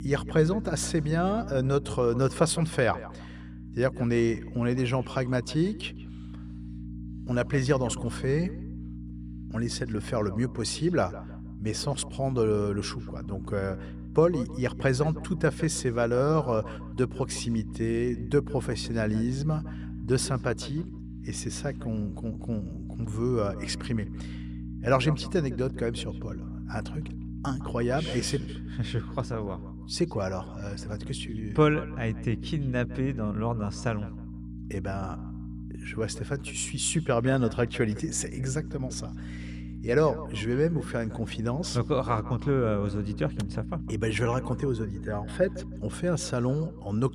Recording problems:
echo of what is said; faint; throughout; 160 ms later, 20 dB below the speech
electrical hum; noticeable; throughout; 60 Hz, 15 dB below the speech

